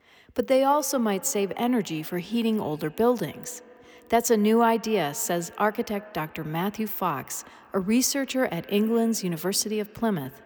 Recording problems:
echo of what is said; faint; throughout; 90 ms later, 20 dB below the speech

